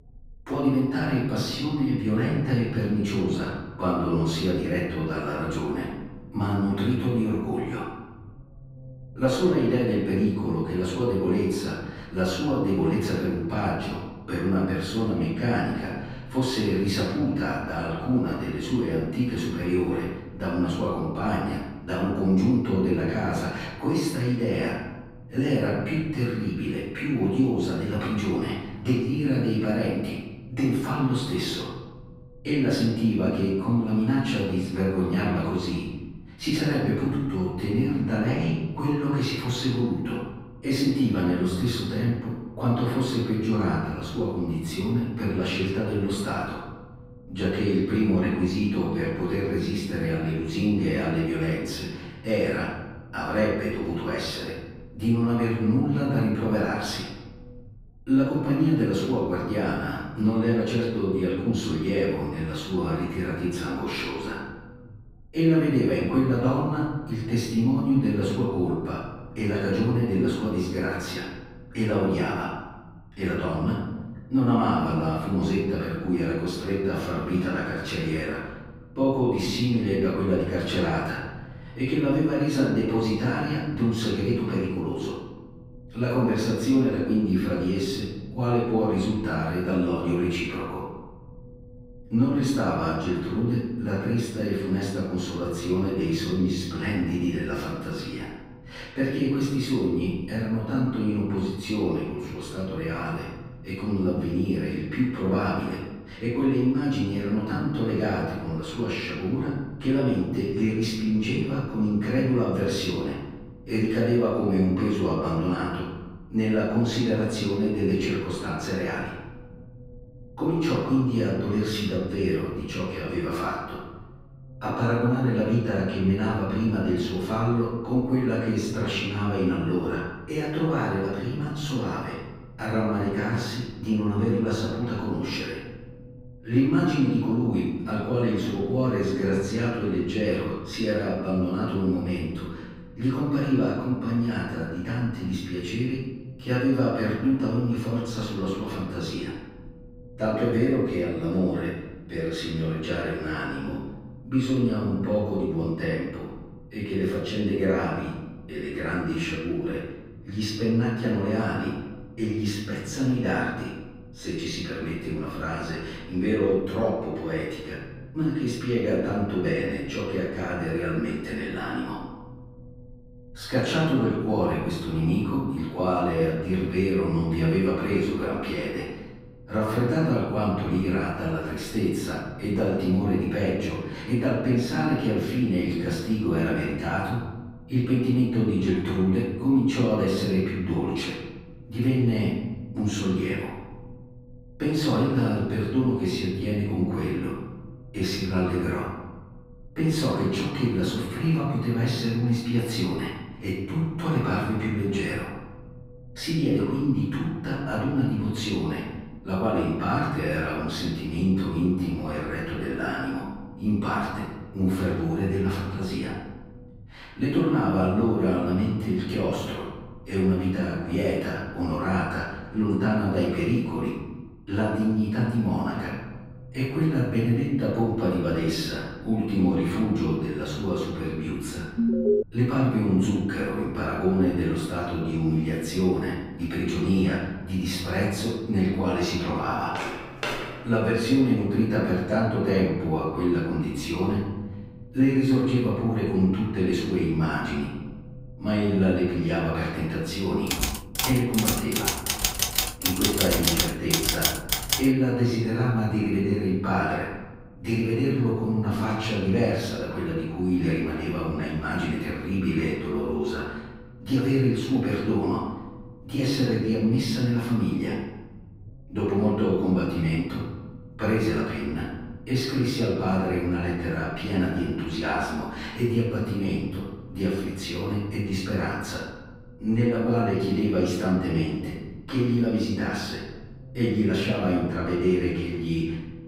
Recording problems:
room echo; strong; dies away in 1.2 s
off-mic speech; far
low rumble; faint; throughout; 25 dB below the speech
alarm; loud; at 3:52; peak 4 dB above the speech
footsteps; noticeable; at 4:00; peak 4 dB below the speech
keyboard typing; loud; from 4:11 to 4:15; peak 4 dB above the speech

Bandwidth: 15.5 kHz